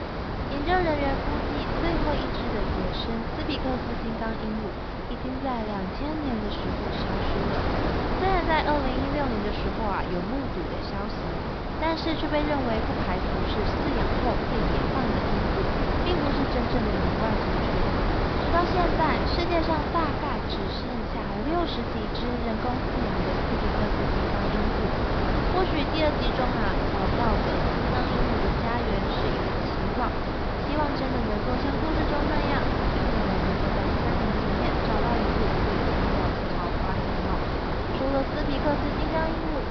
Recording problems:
high frequencies cut off; noticeable; nothing above 5.5 kHz
wind noise on the microphone; heavy; 2 dB above the speech
crackling; very faint; from 7.5 to 10 s, at 22 s and from 35 to 38 s; 25 dB below the speech

